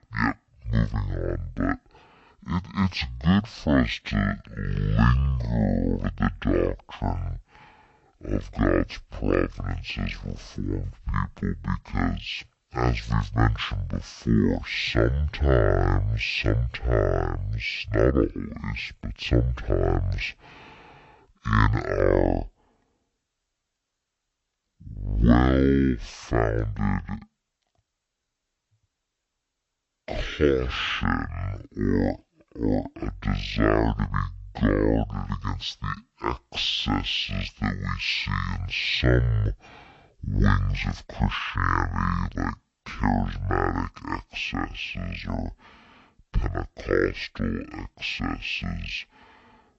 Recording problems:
wrong speed and pitch; too slow and too low; 0.5 times normal speed

